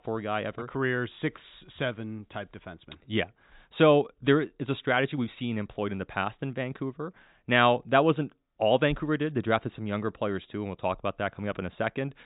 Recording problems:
high frequencies cut off; severe; nothing above 4 kHz

